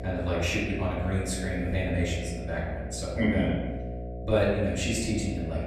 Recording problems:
off-mic speech; far
room echo; noticeable; dies away in 1 s
electrical hum; noticeable; throughout; 60 Hz, 10 dB below the speech

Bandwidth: 14 kHz